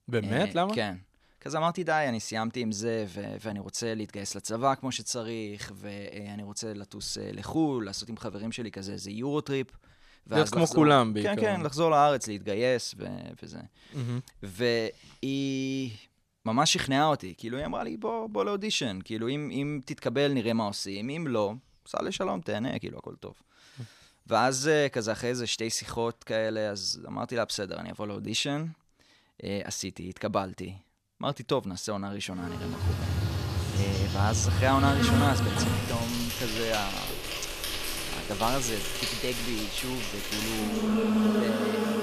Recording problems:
animal sounds; very loud; from 33 s on; as loud as the speech

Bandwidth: 14 kHz